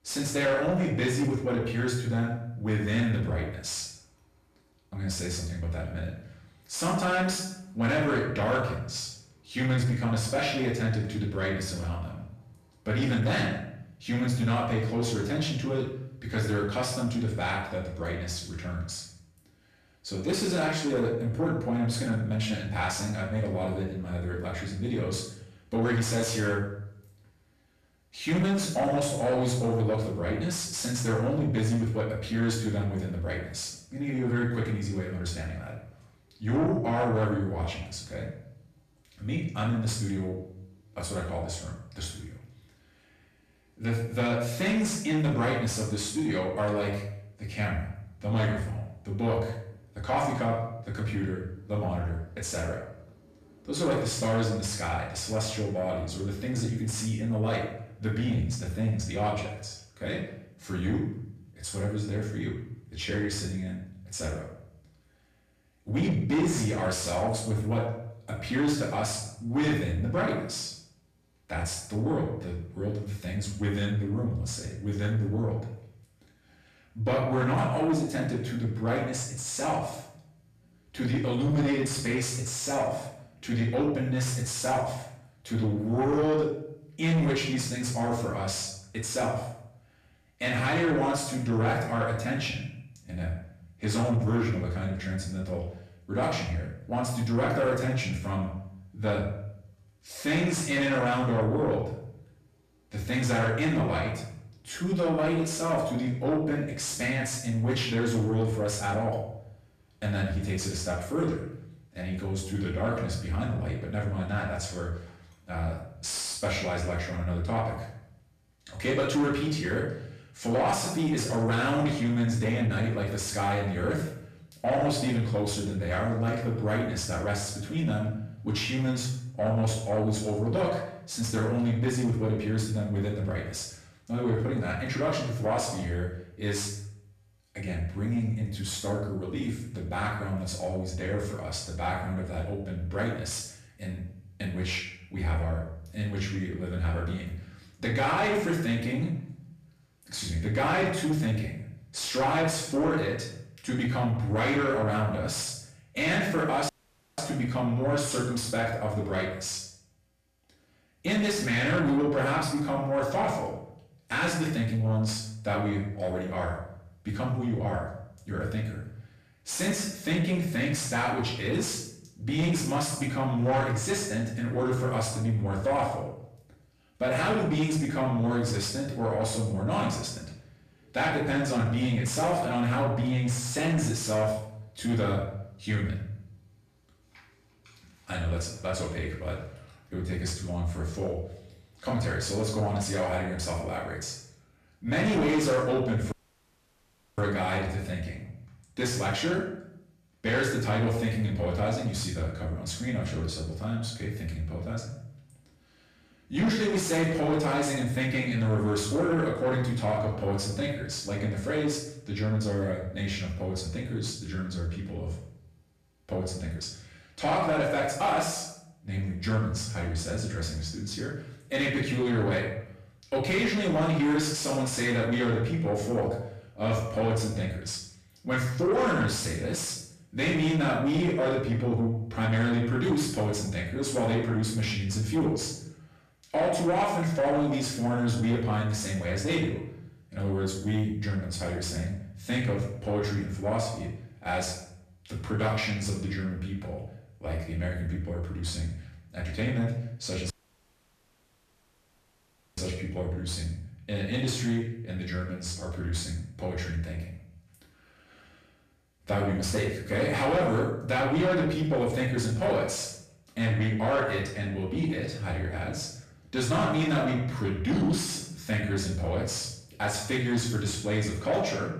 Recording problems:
off-mic speech; far
room echo; noticeable; dies away in 0.6 s
distortion; slight; 10 dB below the speech
audio cutting out; at 2:37, at 3:16 for 1 s and at 4:10 for 2.5 s

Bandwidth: 14.5 kHz